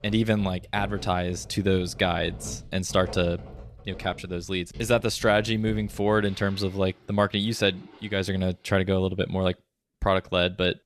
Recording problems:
household noises; noticeable; throughout; 20 dB below the speech

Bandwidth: 13.5 kHz